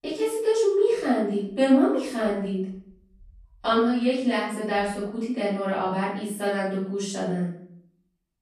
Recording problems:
off-mic speech; far
room echo; noticeable; dies away in 0.6 s

